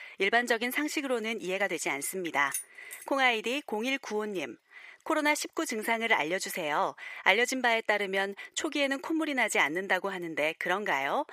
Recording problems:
thin; somewhat; fading below 450 Hz
jangling keys; noticeable; at 2.5 s; peak 8 dB below the speech

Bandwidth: 15 kHz